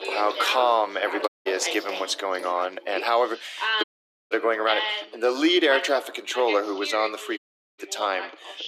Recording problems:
thin; very; fading below 300 Hz
echo of what is said; faint; from 4 s on; 90 ms later, 20 dB below the speech
background chatter; loud; throughout; 2 voices, 7 dB below the speech
rain or running water; noticeable; throughout; 15 dB below the speech
audio cutting out; at 1.5 s, at 4 s and at 7.5 s

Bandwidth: 14.5 kHz